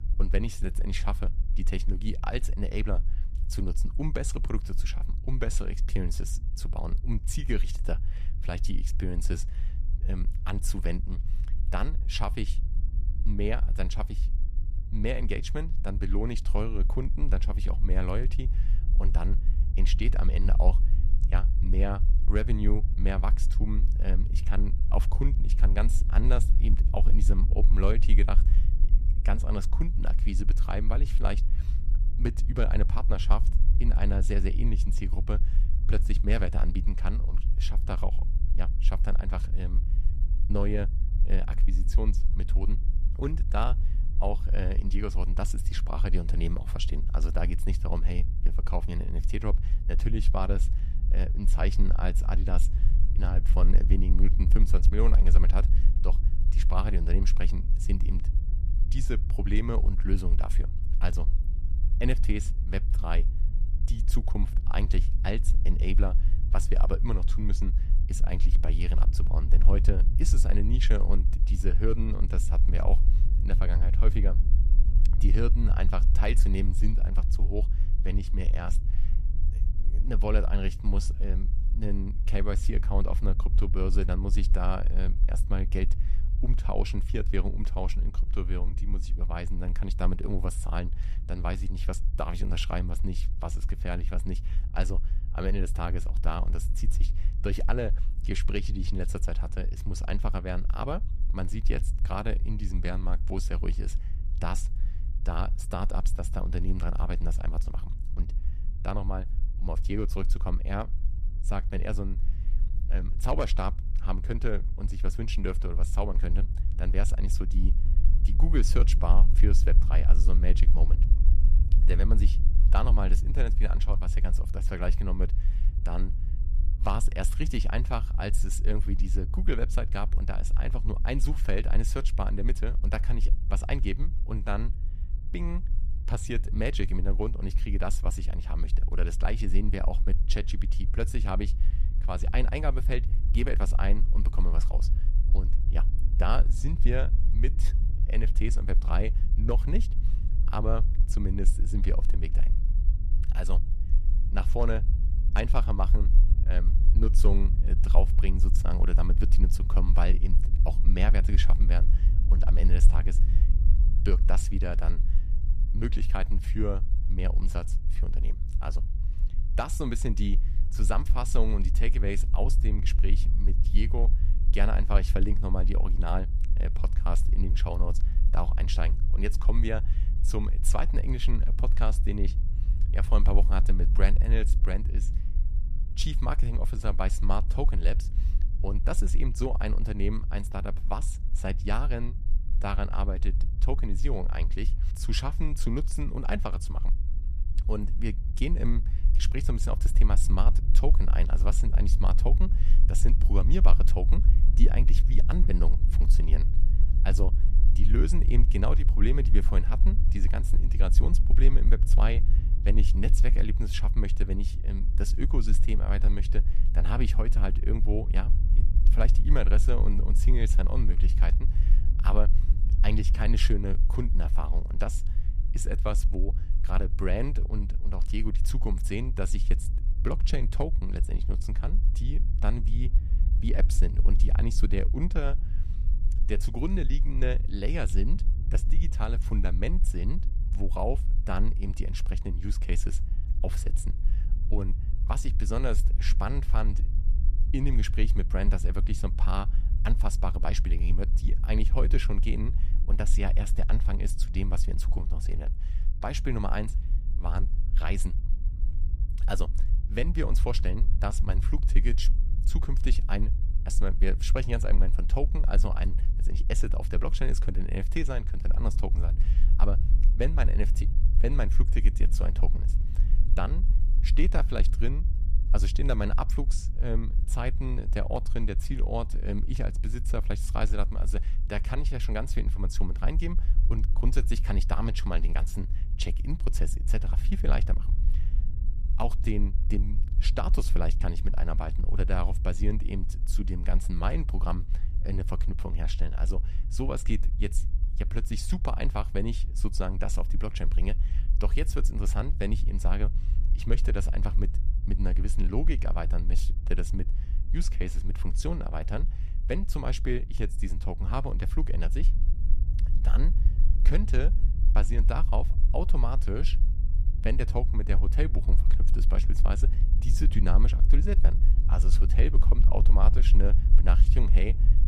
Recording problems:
low rumble; noticeable; throughout; 10 dB below the speech

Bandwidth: 14.5 kHz